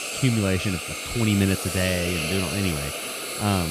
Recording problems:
hiss; loud; throughout; 3 dB below the speech
abrupt cut into speech; at the end

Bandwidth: 14.5 kHz